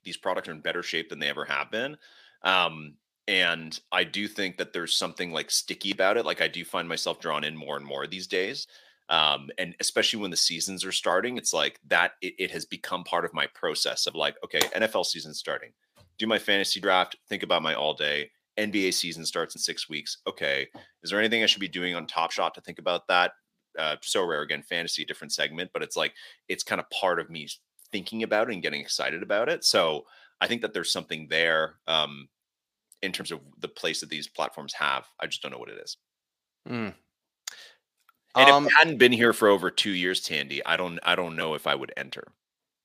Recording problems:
thin; very slightly; fading below 1 kHz

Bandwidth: 15 kHz